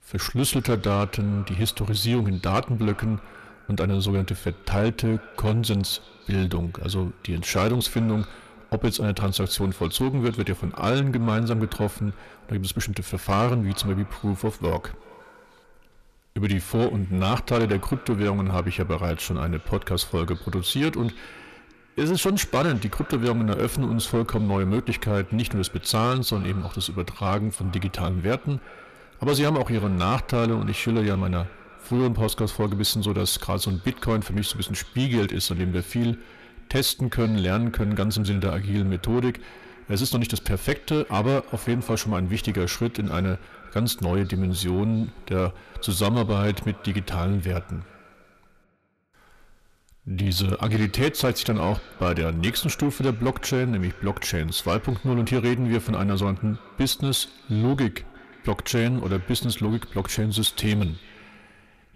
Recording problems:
echo of what is said; faint; throughout; 360 ms later, 20 dB below the speech
distortion; slight; 10 dB below the speech

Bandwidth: 14.5 kHz